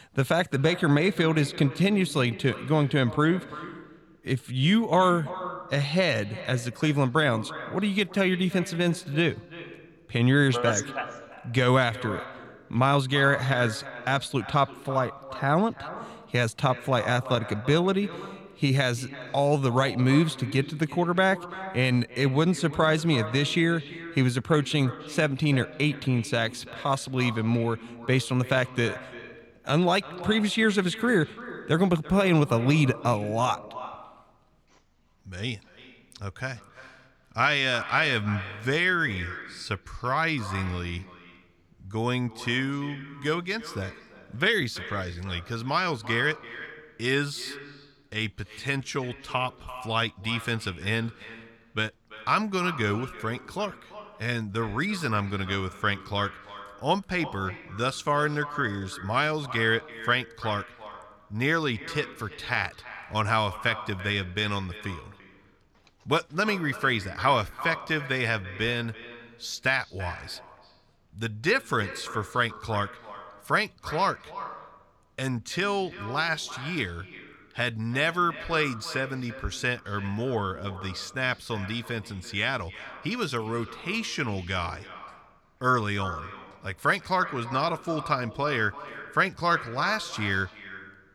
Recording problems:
echo of what is said; noticeable; throughout; 340 ms later, 15 dB below the speech

